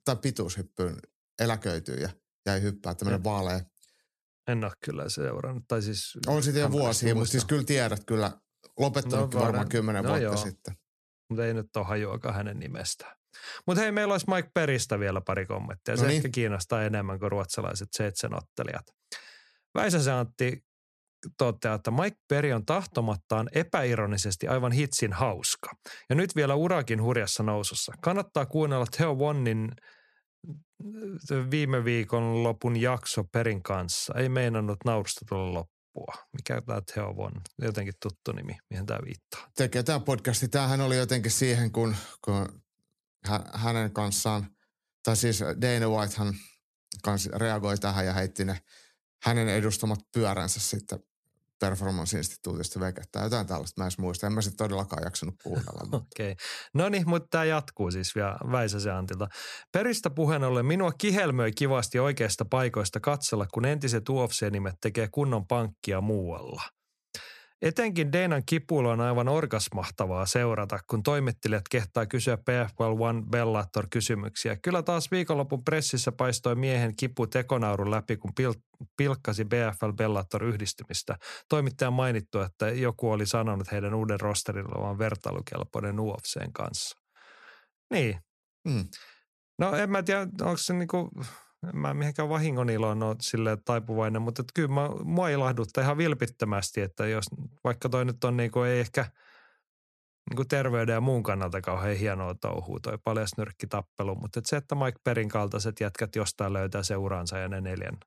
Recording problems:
none

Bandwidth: 13.5 kHz